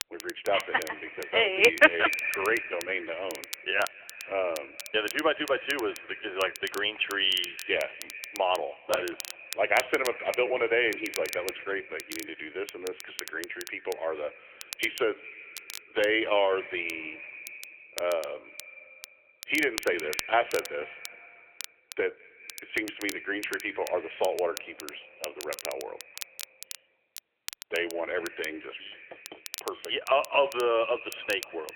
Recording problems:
echo of what is said; noticeable; throughout; 200 ms later, 15 dB below the speech
phone-call audio; nothing above 3 kHz
crackle, like an old record; noticeable; 15 dB below the speech

